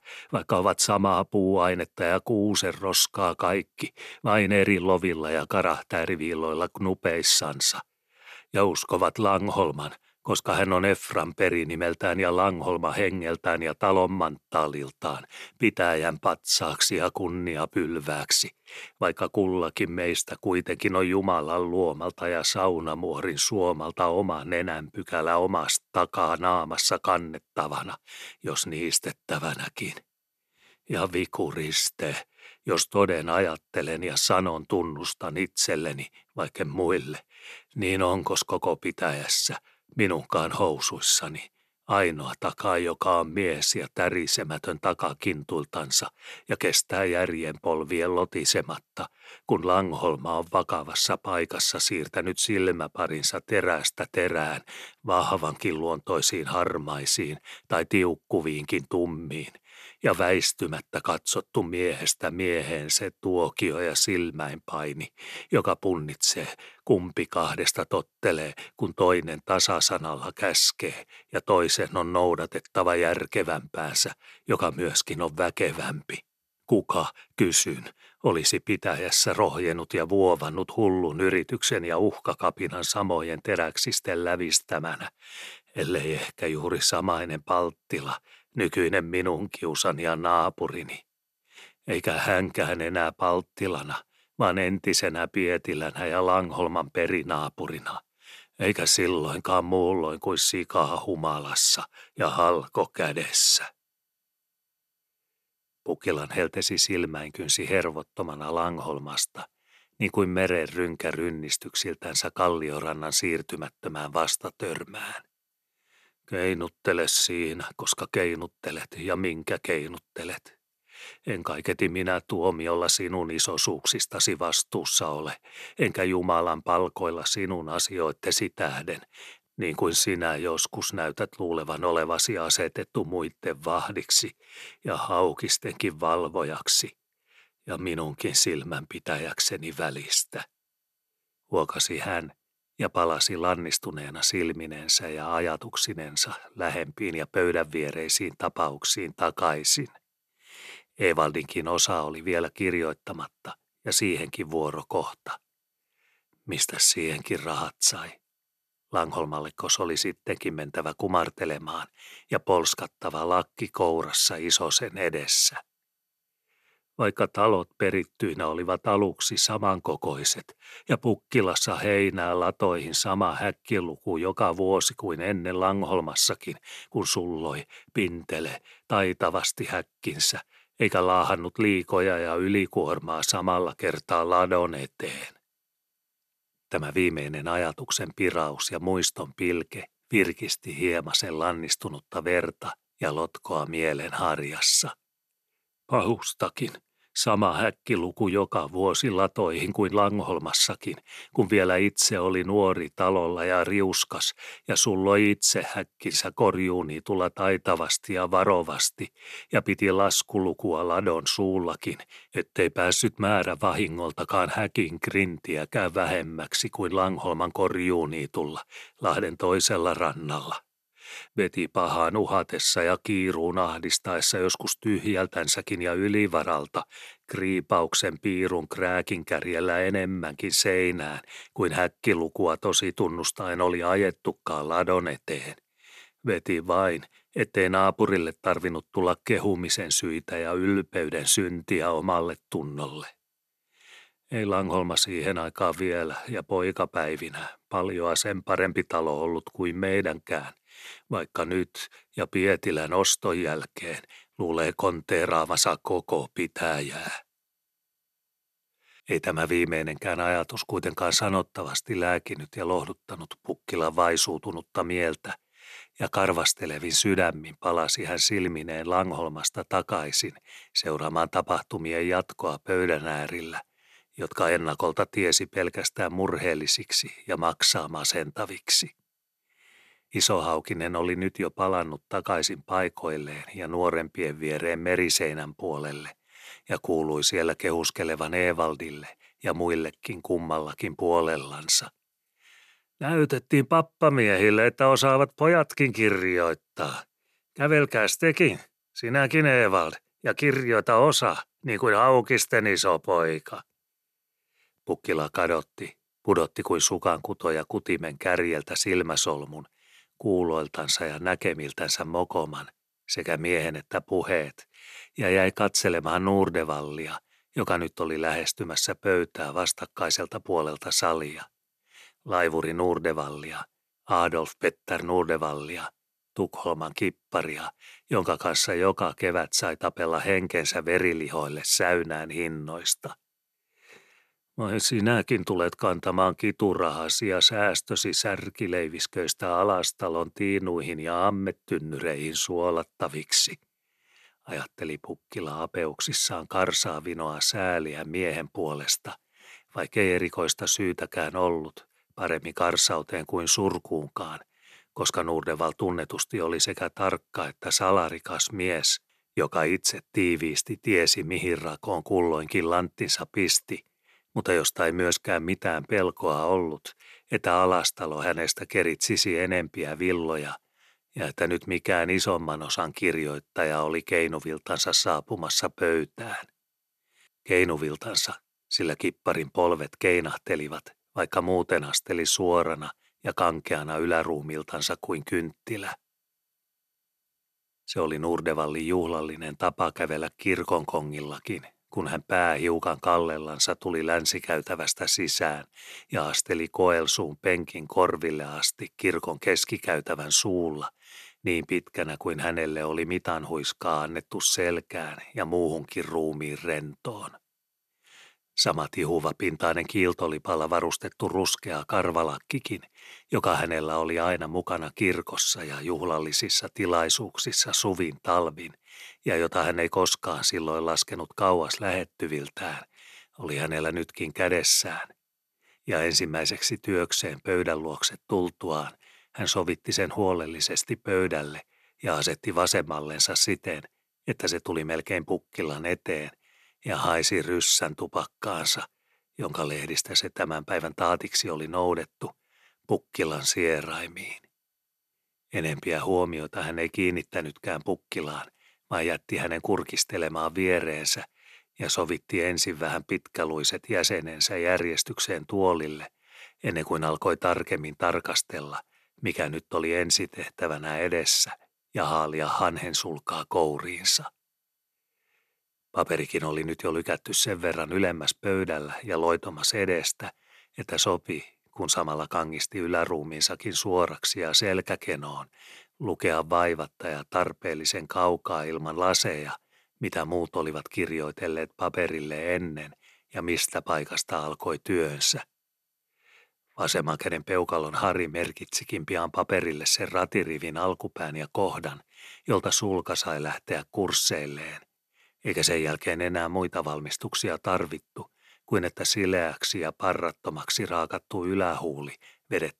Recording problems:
none

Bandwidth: 13.5 kHz